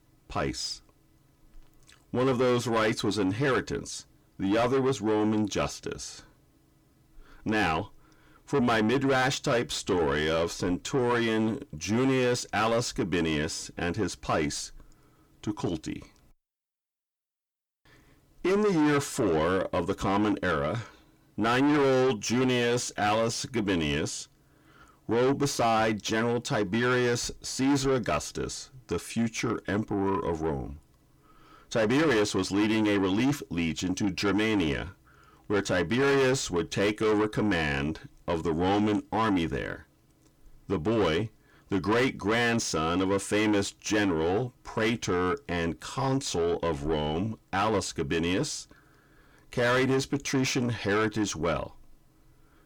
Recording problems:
distortion; heavy; 6 dB below the speech

